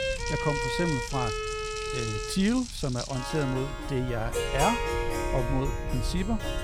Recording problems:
household noises; loud; until 3.5 s; 8 dB below the speech
background music; loud; throughout; 2 dB below the speech
low rumble; faint; throughout; 25 dB below the speech

